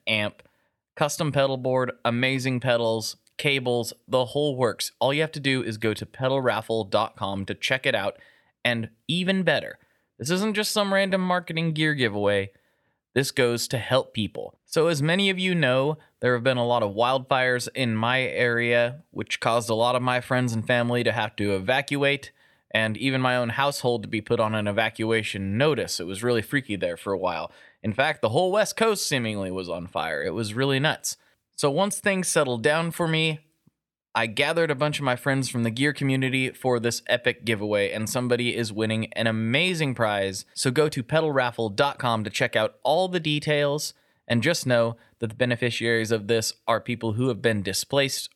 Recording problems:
none

